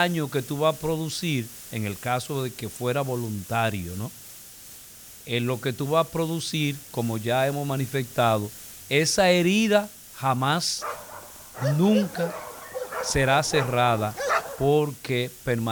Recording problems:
hiss; noticeable; throughout; 15 dB below the speech
abrupt cut into speech; at the start and the end
dog barking; noticeable; from 11 to 15 s; peak 1 dB below the speech

